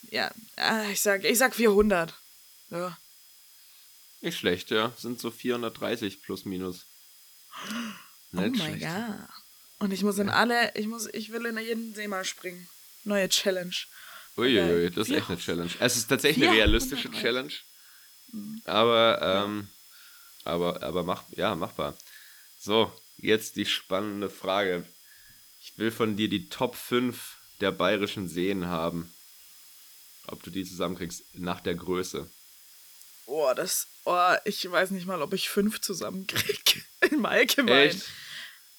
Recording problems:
high-pitched whine; faint; throughout; 5 kHz, 35 dB below the speech
hiss; faint; throughout; 25 dB below the speech

